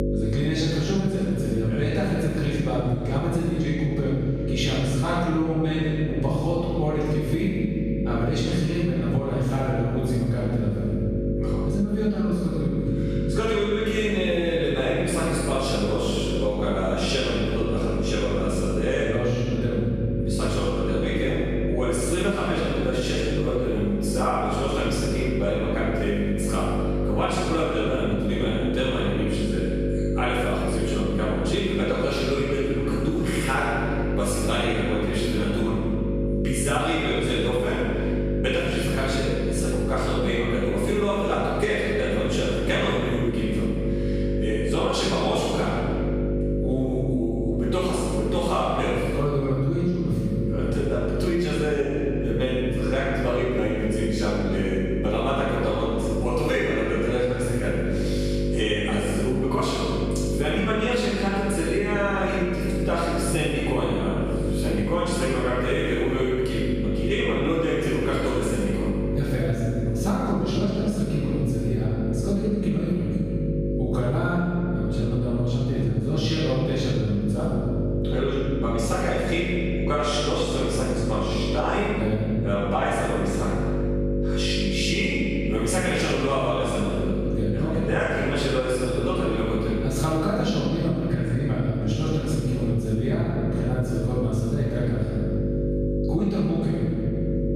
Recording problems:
room echo; strong; dies away in 1.7 s
off-mic speech; far
squashed, flat; somewhat
electrical hum; loud; throughout; 50 Hz, 6 dB below the speech

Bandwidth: 15 kHz